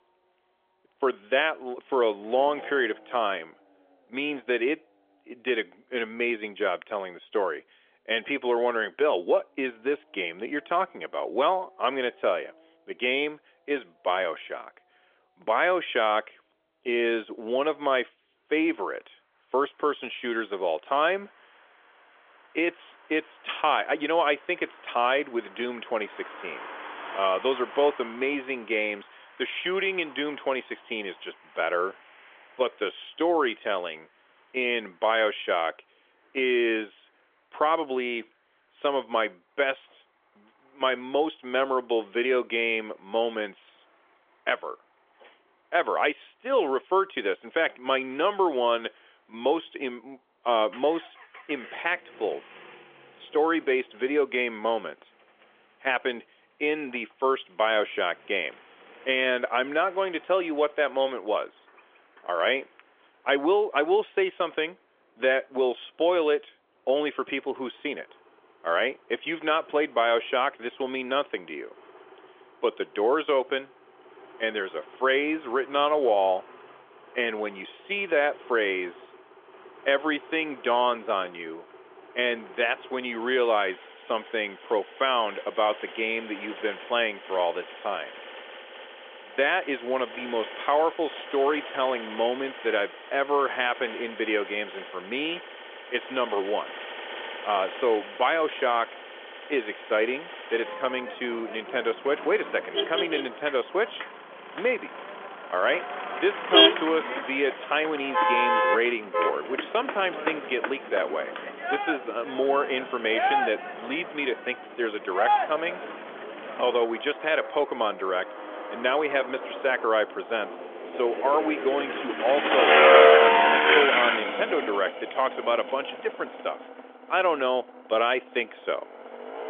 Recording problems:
phone-call audio; nothing above 3.5 kHz
traffic noise; loud; throughout; as loud as the speech

